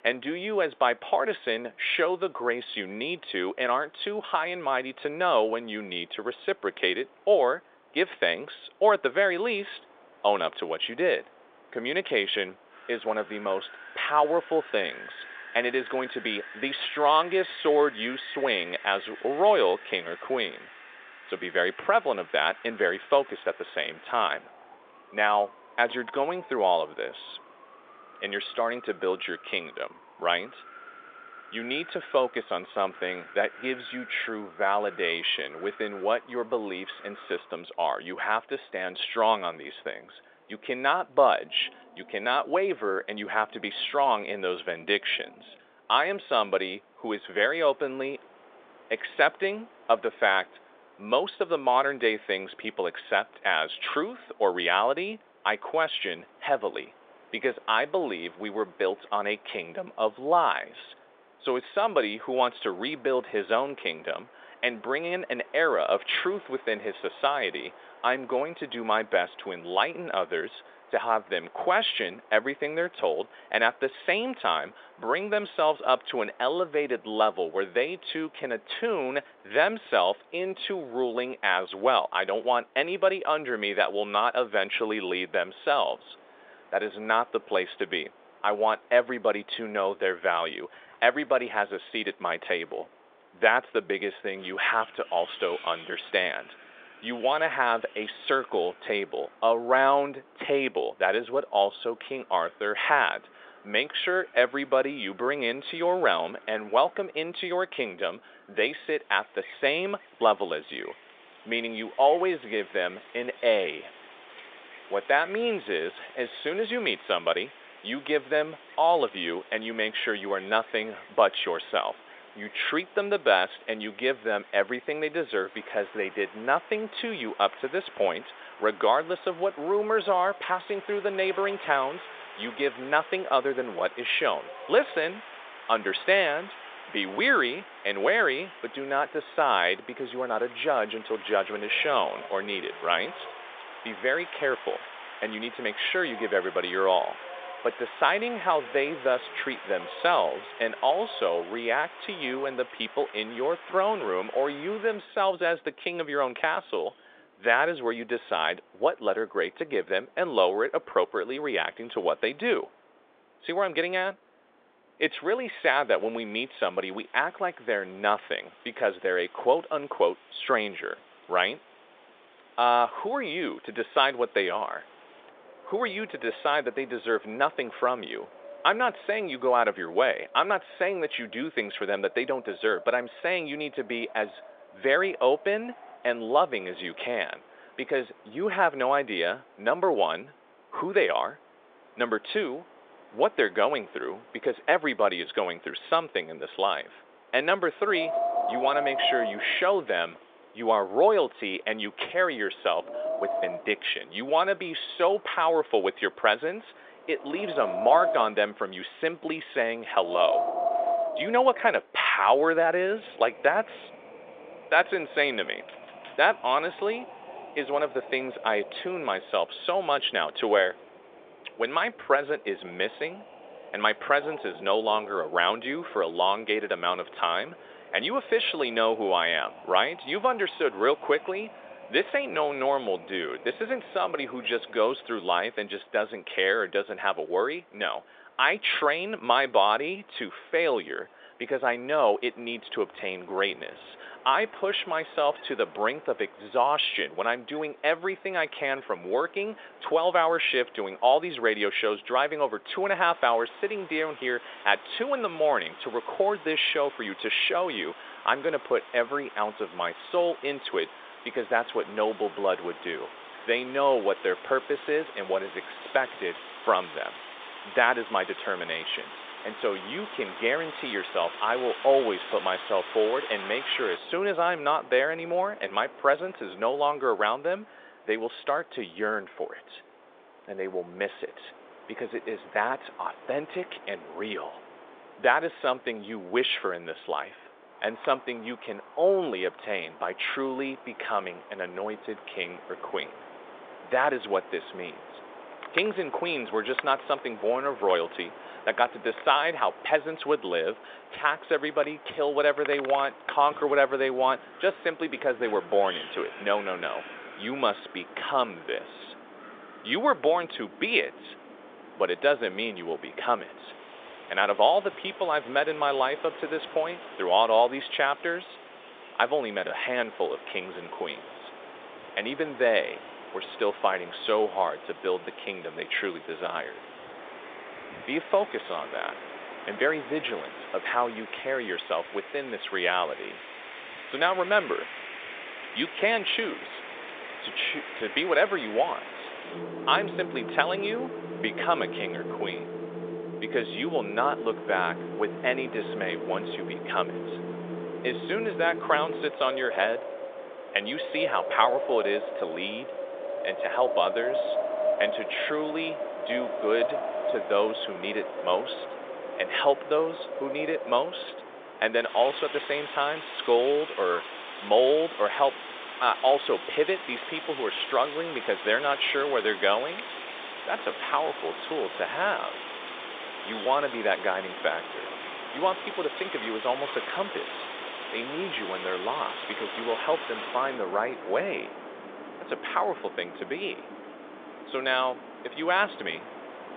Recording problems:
phone-call audio; nothing above 3.5 kHz
wind in the background; noticeable; throughout; 10 dB below the speech

